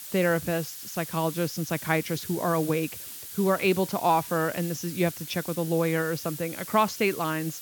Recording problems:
high frequencies cut off; noticeable; nothing above 8 kHz
hiss; loud; throughout; 10 dB below the speech

